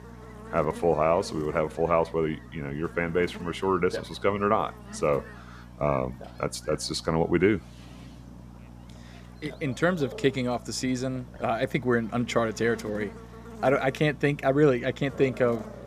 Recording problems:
electrical hum; faint; throughout; 60 Hz, 20 dB below the speech
animal sounds; faint; throughout; 25 dB below the speech

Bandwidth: 14.5 kHz